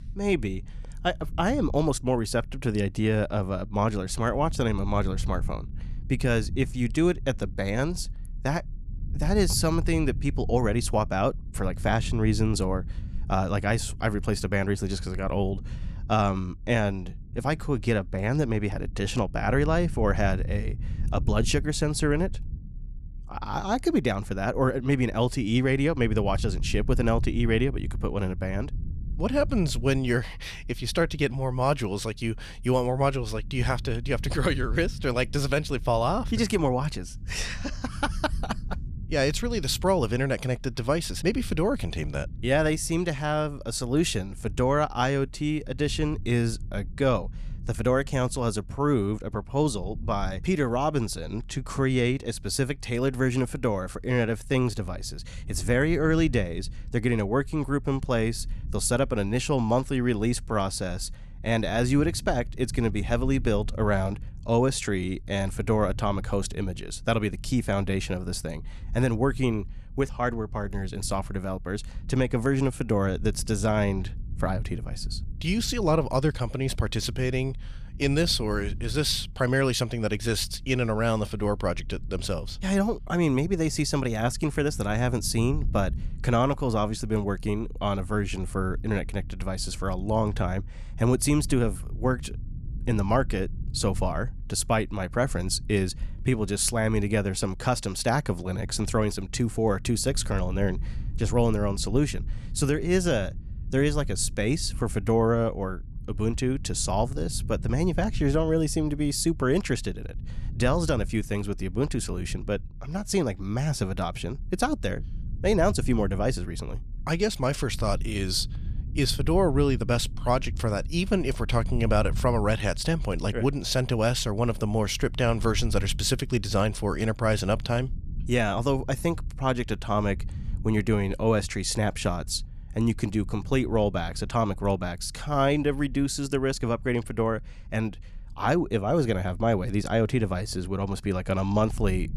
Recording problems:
low rumble; faint; throughout; 25 dB below the speech

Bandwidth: 13.5 kHz